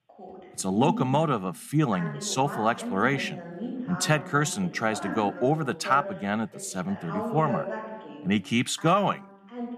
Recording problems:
voice in the background; loud; throughout; 10 dB below the speech

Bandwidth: 14.5 kHz